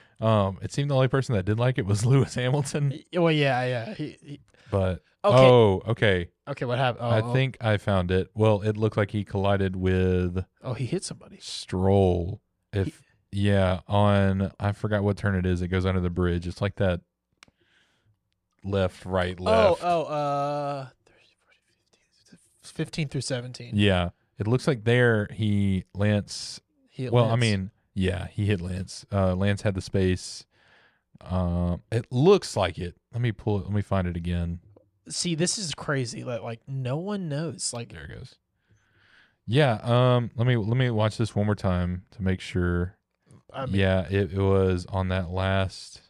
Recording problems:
none

